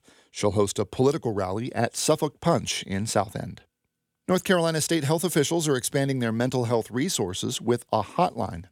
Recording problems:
none

